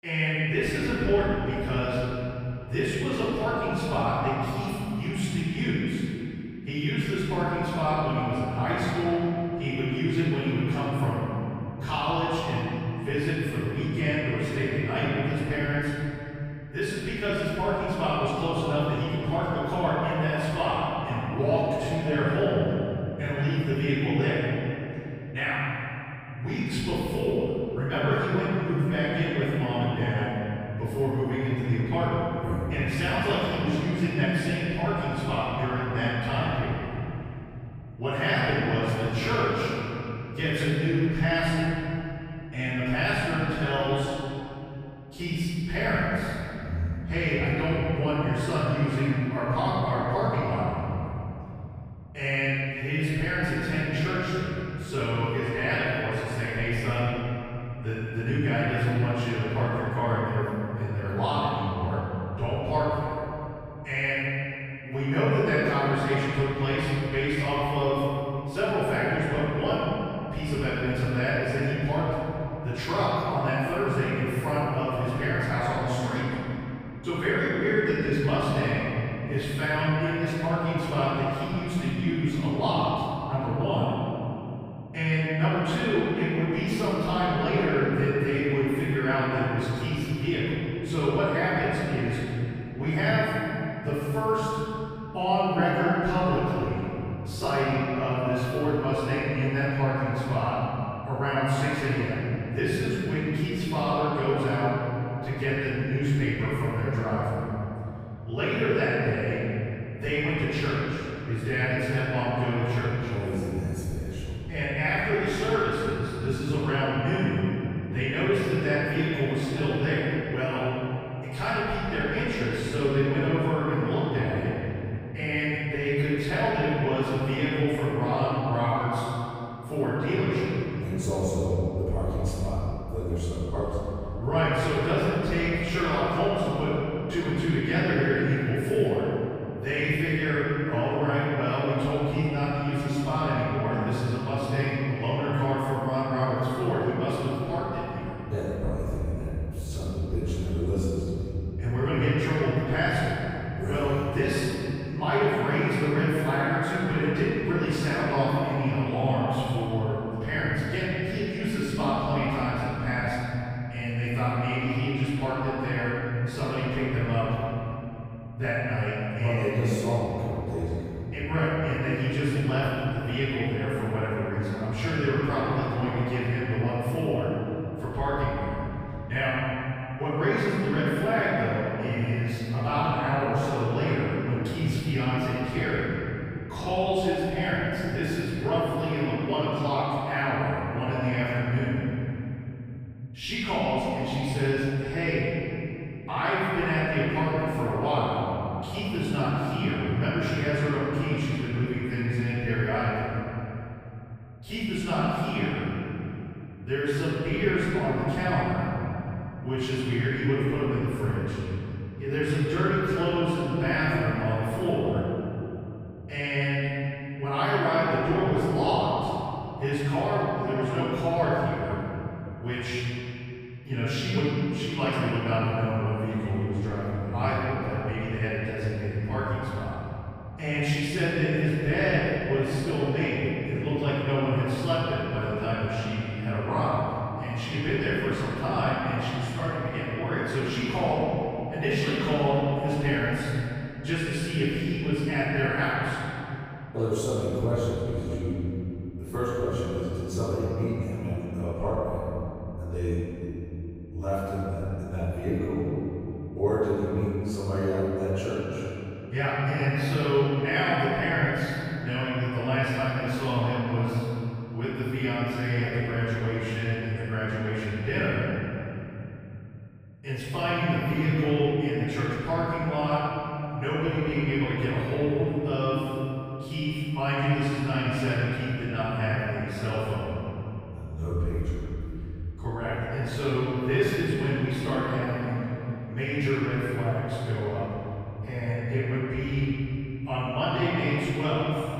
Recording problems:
room echo; strong; dies away in 3 s
off-mic speech; far

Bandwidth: 15.5 kHz